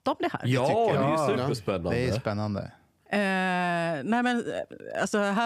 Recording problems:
abrupt cut into speech; at the end

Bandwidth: 15 kHz